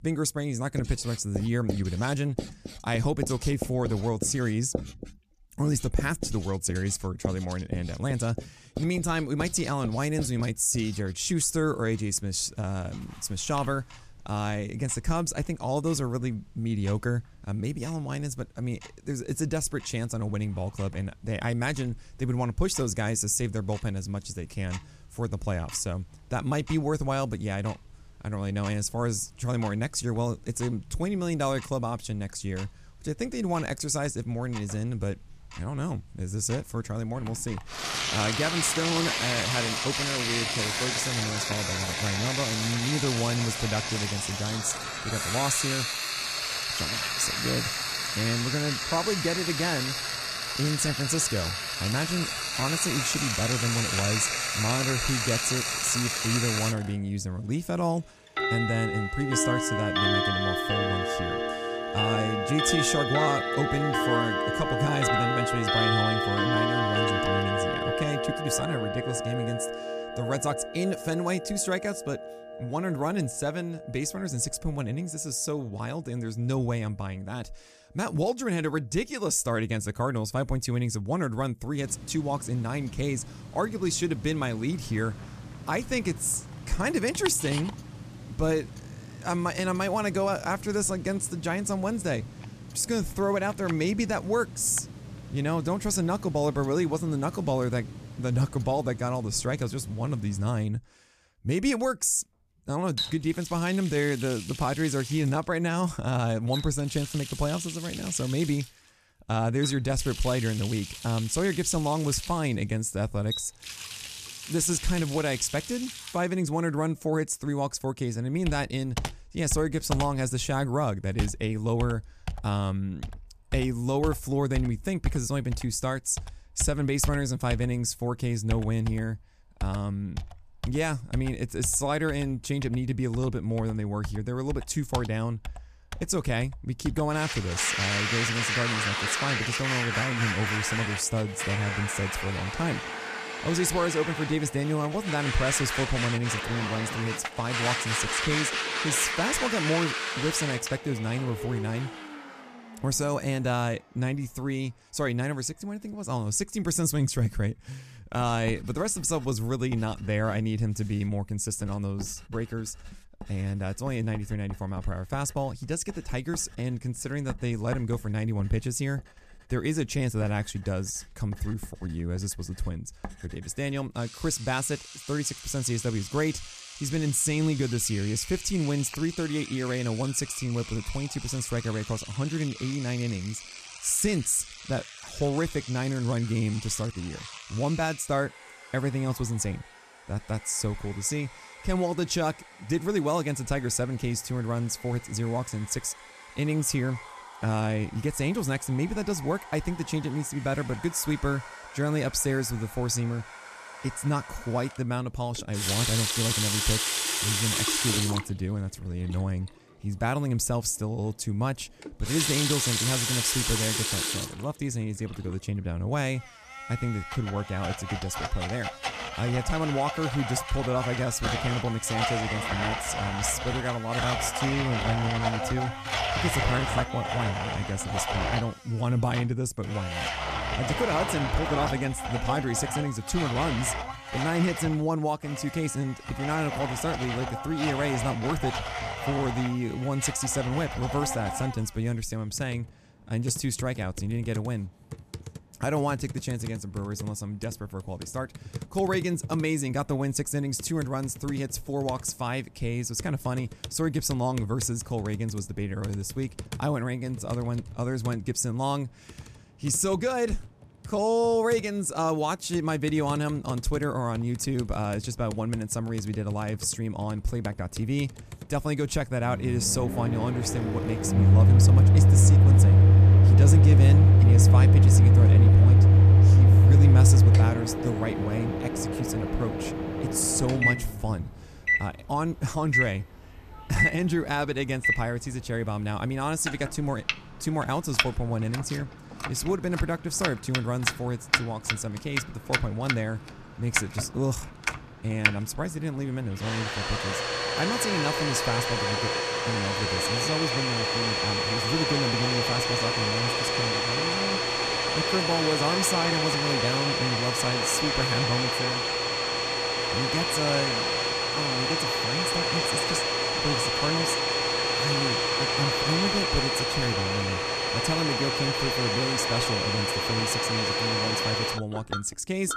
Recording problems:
household noises; very loud; throughout; 3 dB above the speech

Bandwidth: 14.5 kHz